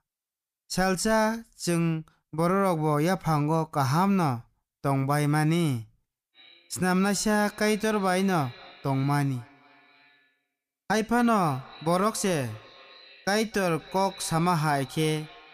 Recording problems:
echo of what is said; faint; from 6.5 s on; 250 ms later, 20 dB below the speech

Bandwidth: 15 kHz